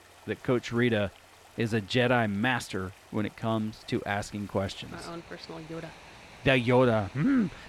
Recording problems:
rain or running water; faint; throughout; 25 dB below the speech

